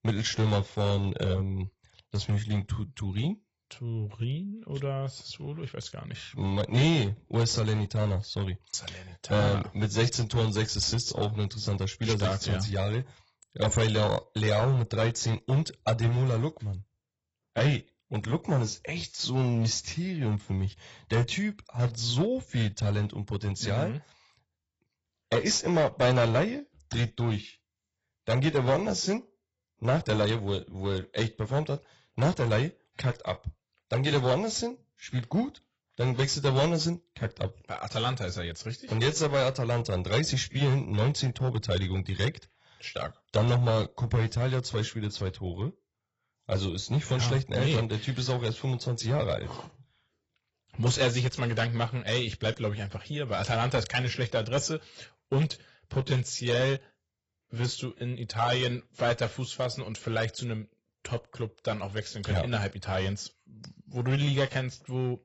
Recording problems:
garbled, watery; badly; nothing above 7.5 kHz
distortion; slight; 4% of the sound clipped

